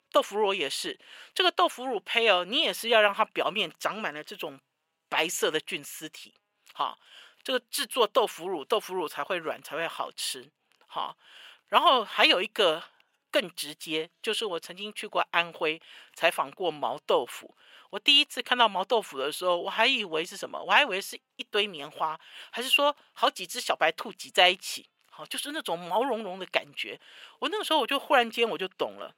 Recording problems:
thin; very; fading below 600 Hz

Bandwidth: 16 kHz